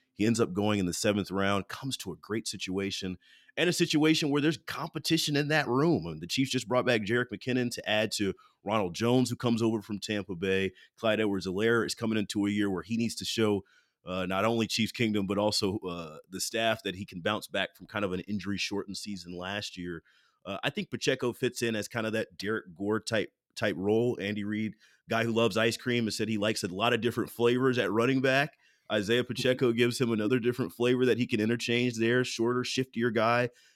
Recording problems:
none

